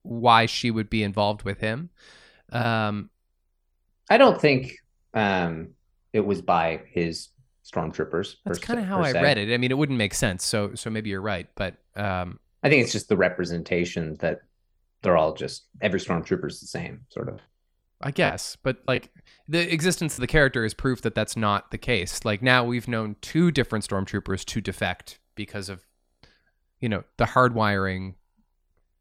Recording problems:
choppy; very; from 17 to 20 s; 9% of the speech affected

